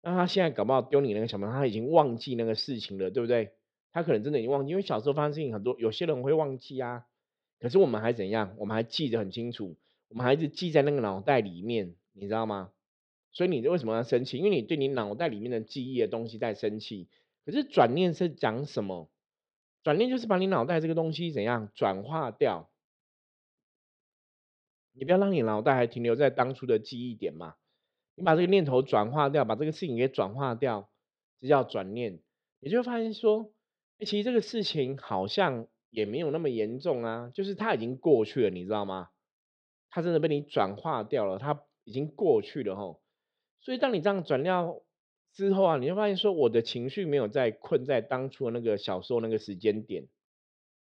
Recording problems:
muffled; slightly; fading above 4 kHz

